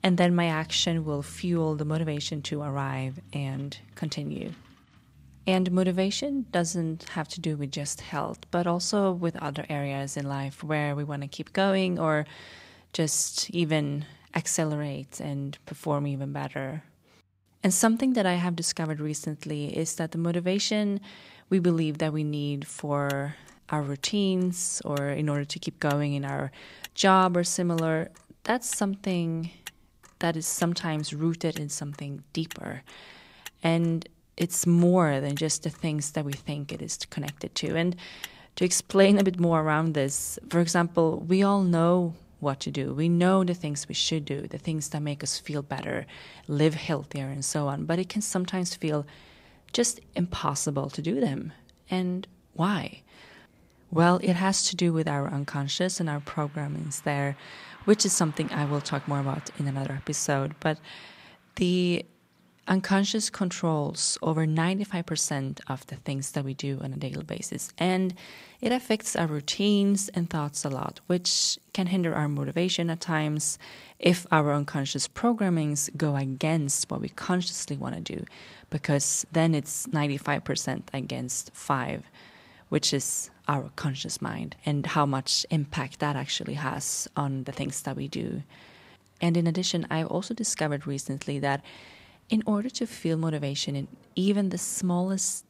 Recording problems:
traffic noise; faint; throughout; 25 dB below the speech

